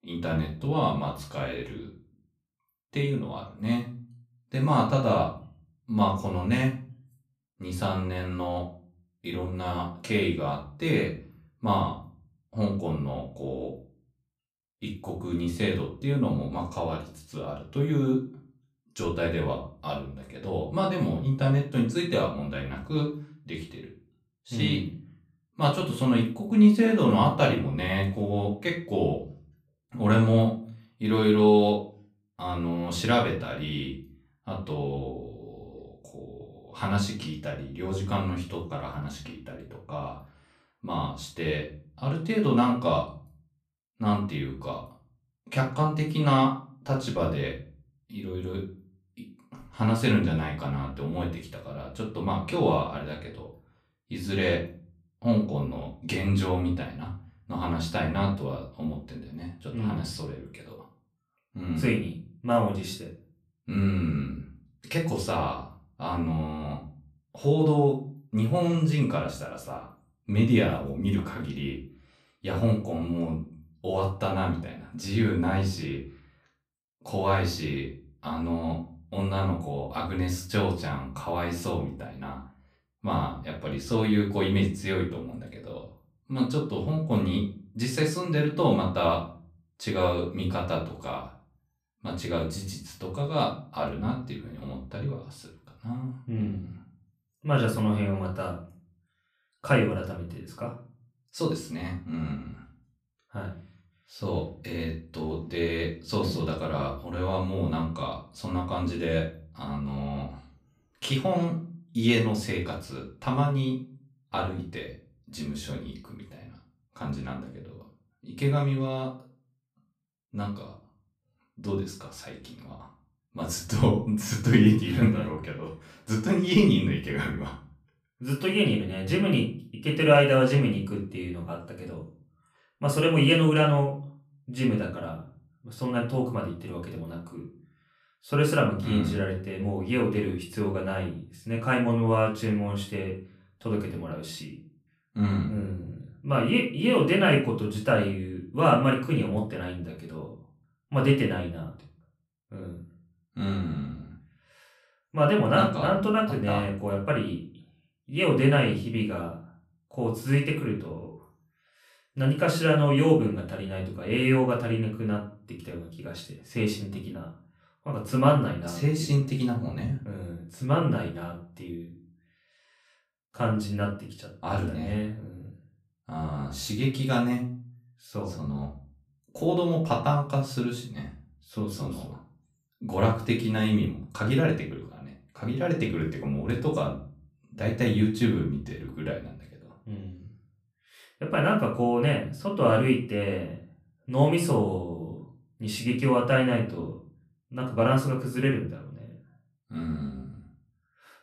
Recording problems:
off-mic speech; far
room echo; slight; dies away in 0.3 s

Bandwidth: 14.5 kHz